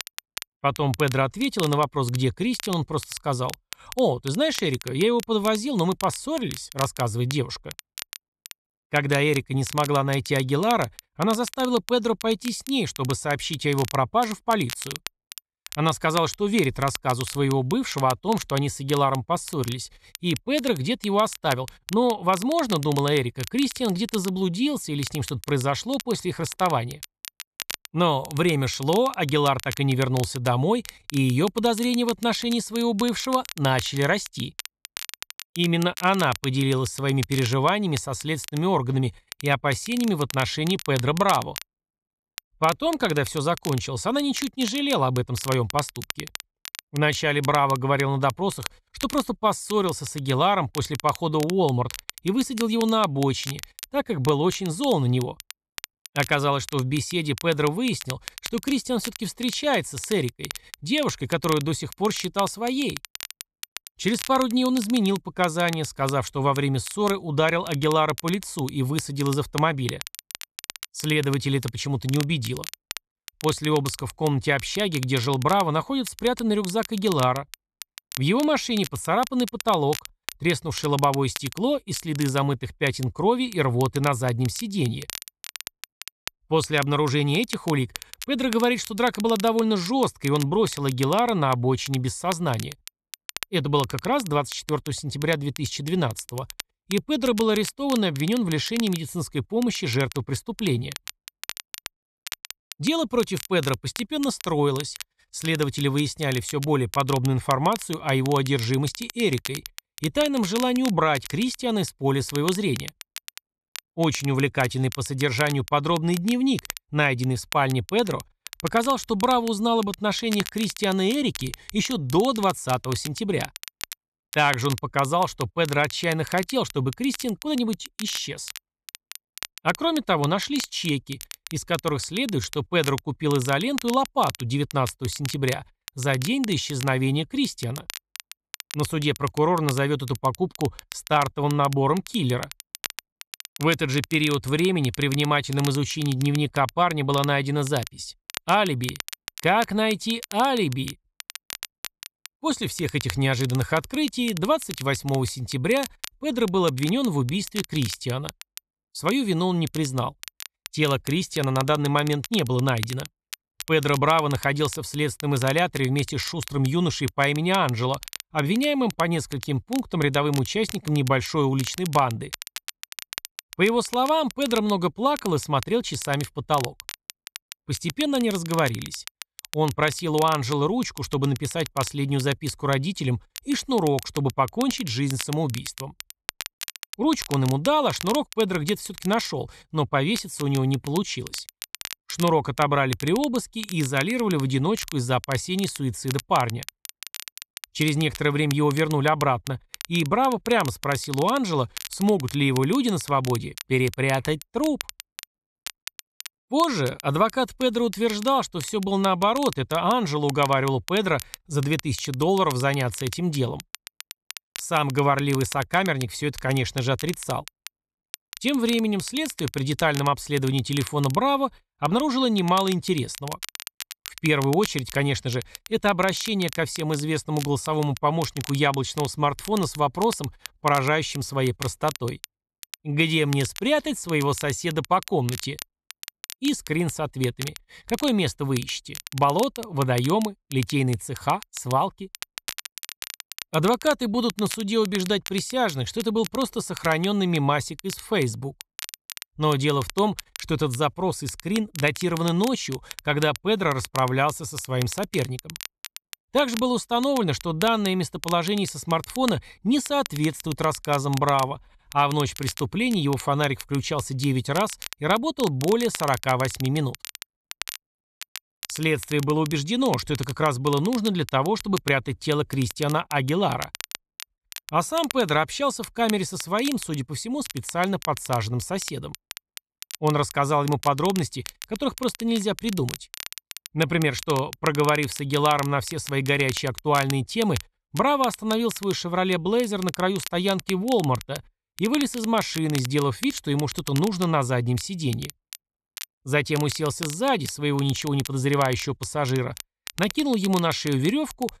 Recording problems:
crackle, like an old record; noticeable; 15 dB below the speech

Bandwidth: 14 kHz